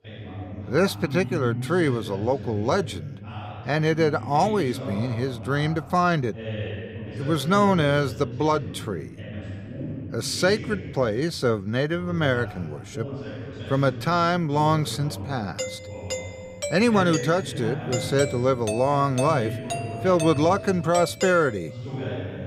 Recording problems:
voice in the background; noticeable; throughout; 10 dB below the speech
doorbell; noticeable; from 16 to 22 s; peak 6 dB below the speech

